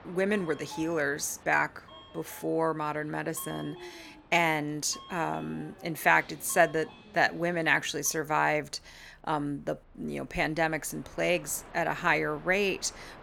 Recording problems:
train or aircraft noise; faint; throughout; 20 dB below the speech

